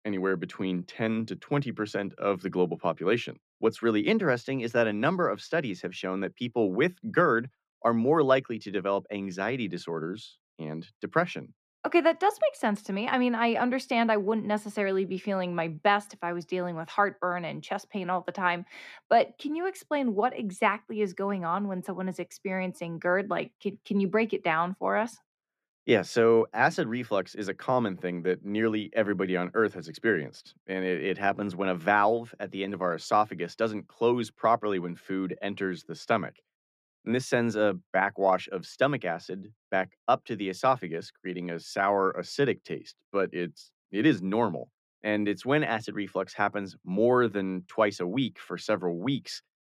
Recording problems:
muffled; slightly; fading above 3.5 kHz

